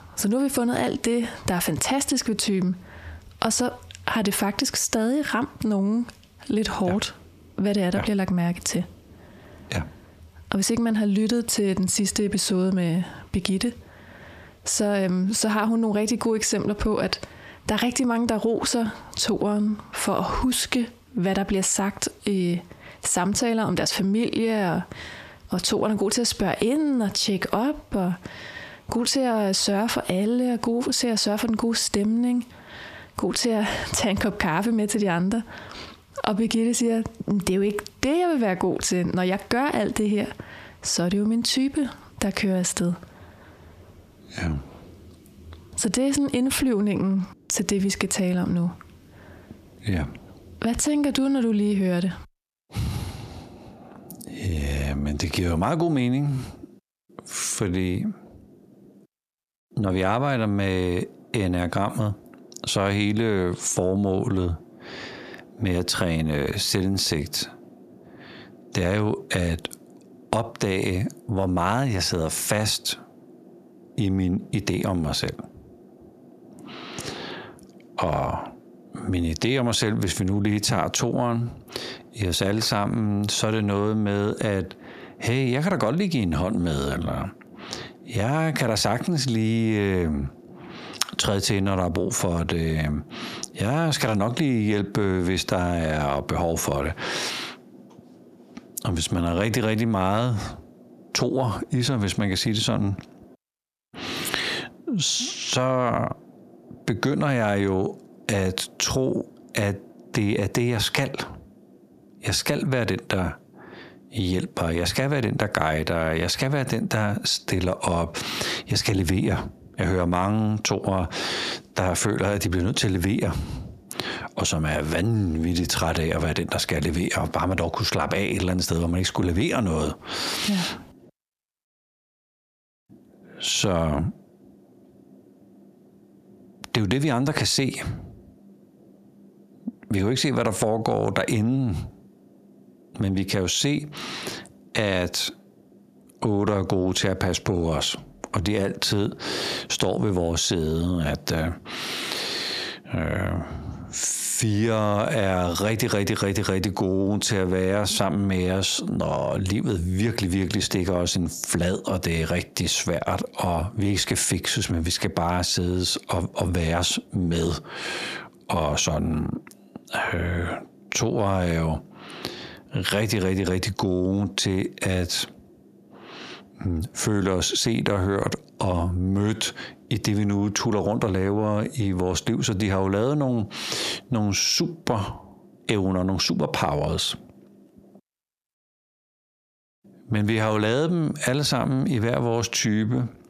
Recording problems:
squashed, flat; heavily

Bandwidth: 14.5 kHz